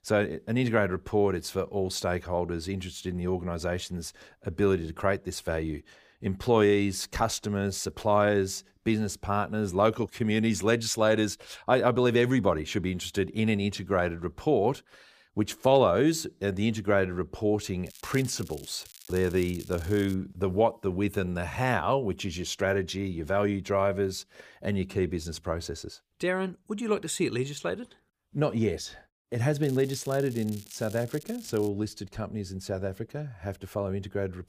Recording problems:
crackling; noticeable; from 18 to 20 s and from 30 to 32 s; 20 dB below the speech

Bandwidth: 15 kHz